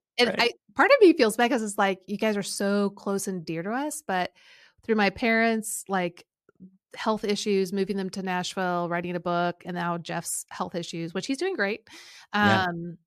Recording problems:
none

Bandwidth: 14.5 kHz